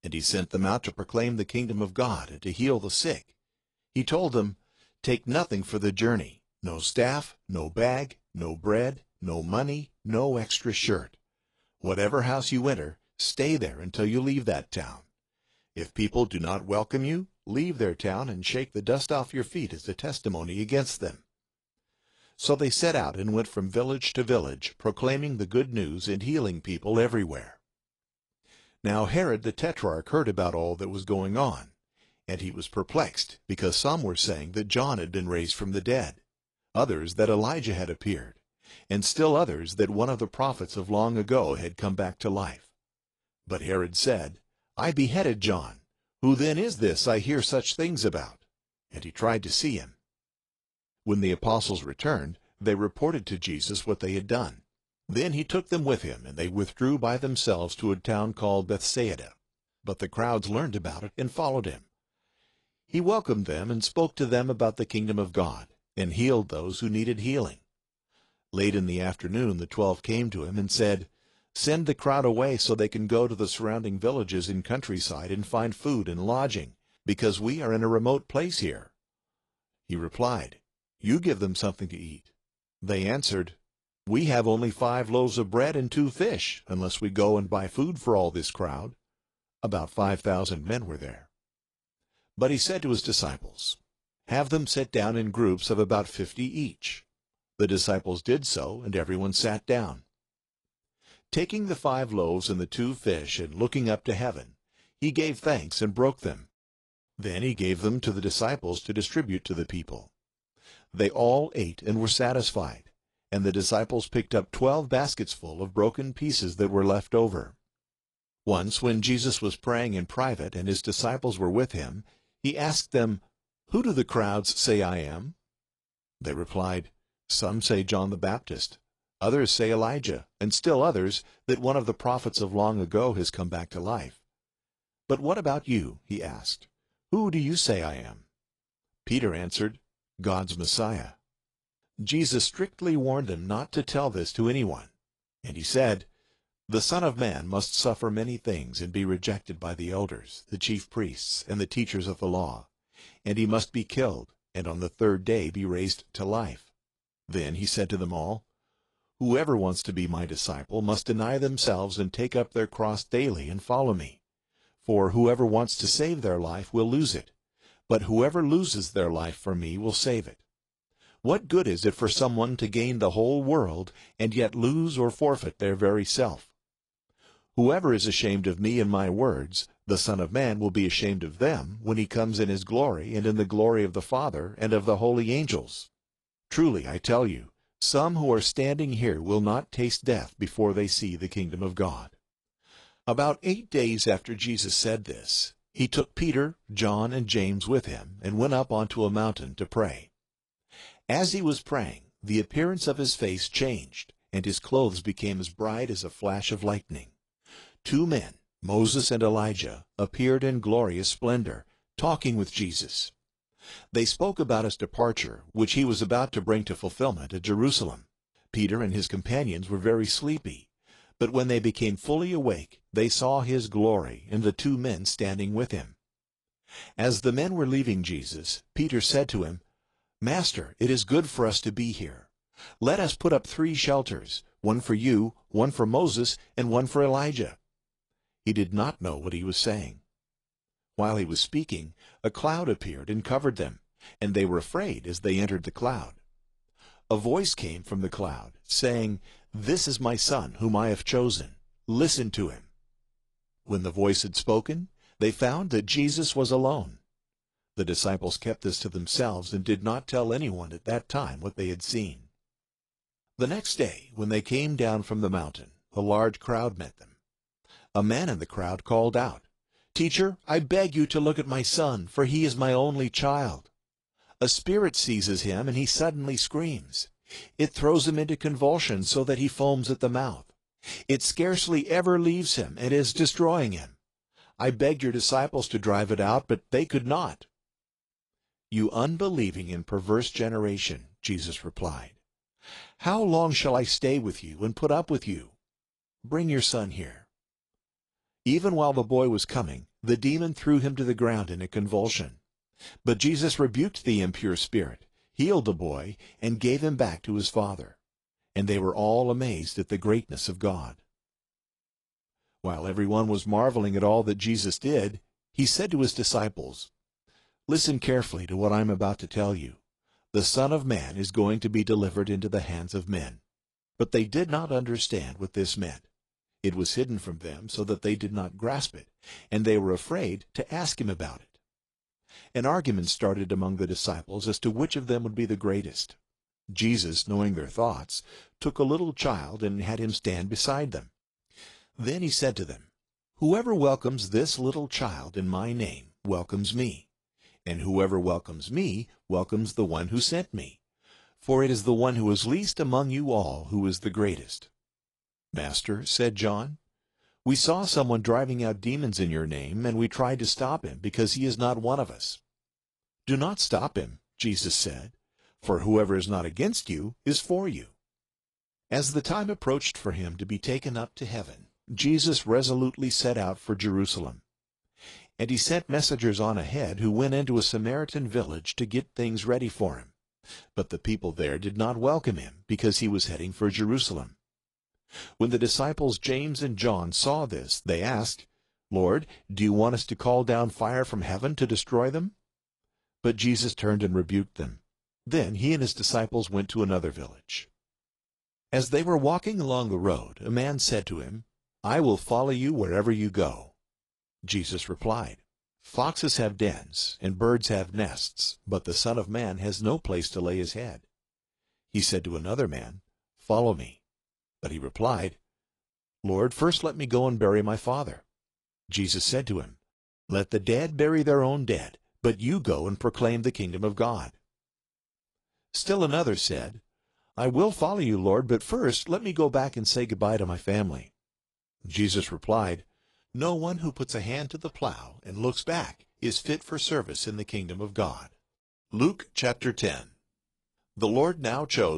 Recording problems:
garbled, watery; slightly; nothing above 10.5 kHz
abrupt cut into speech; at the end

